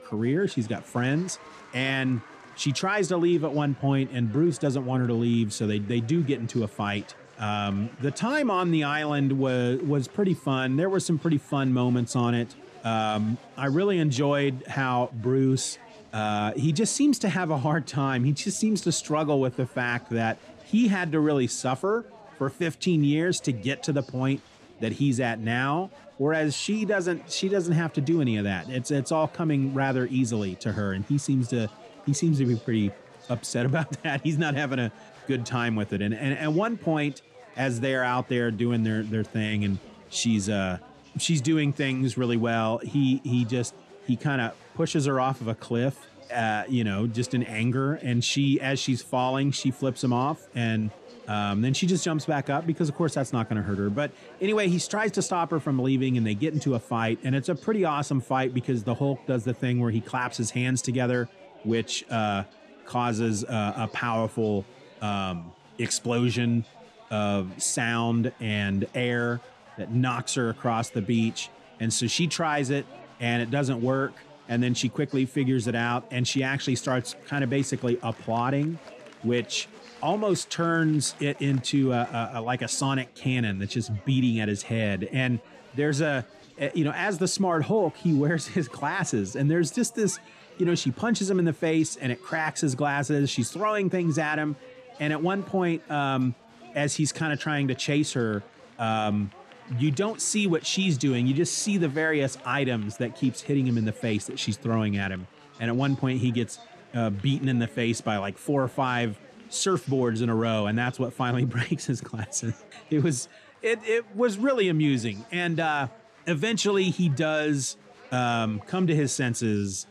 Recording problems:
chatter from many people; faint; throughout; 25 dB below the speech

